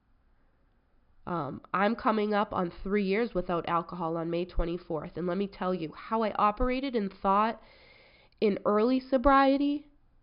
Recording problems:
high frequencies cut off; noticeable; nothing above 5.5 kHz

